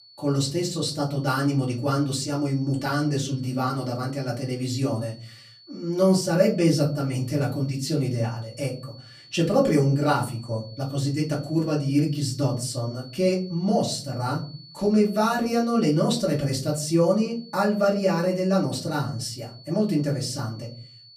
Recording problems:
off-mic speech; far
room echo; very slight; dies away in 0.5 s
high-pitched whine; faint; throughout; 4.5 kHz, 20 dB below the speech

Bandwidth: 14.5 kHz